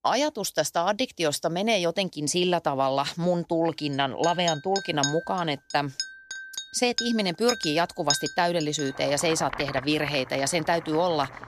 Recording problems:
household noises; loud; from 4 s on; 8 dB below the speech

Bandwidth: 14.5 kHz